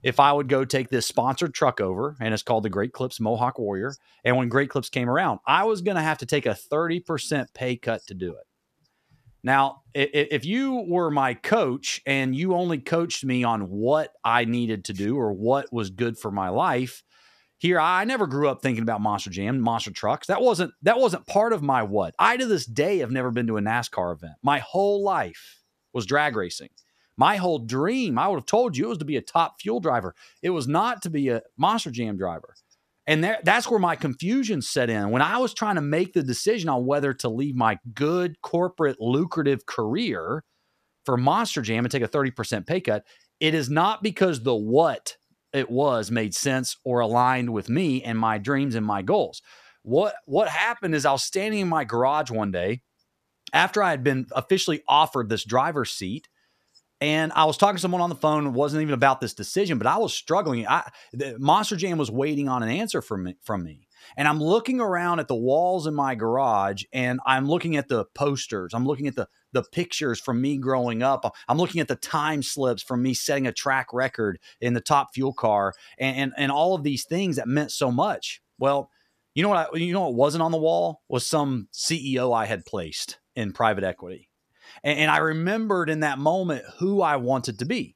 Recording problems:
none

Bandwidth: 14.5 kHz